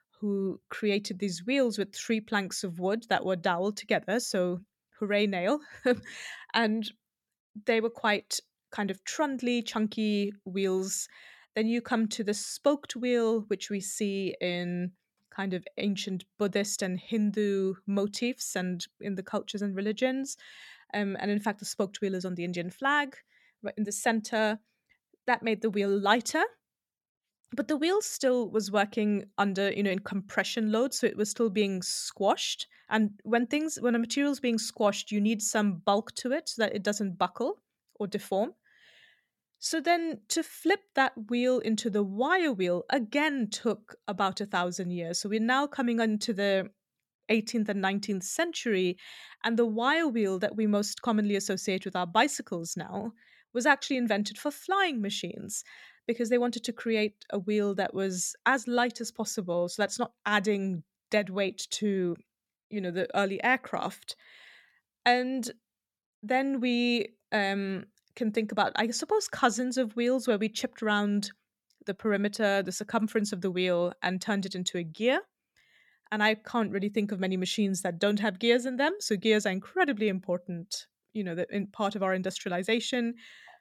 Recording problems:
none

